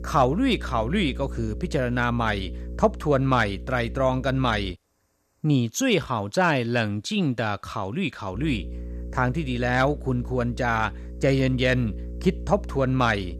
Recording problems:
electrical hum; faint; until 4.5 s and from 8.5 s on; 60 Hz, 20 dB below the speech

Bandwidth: 14 kHz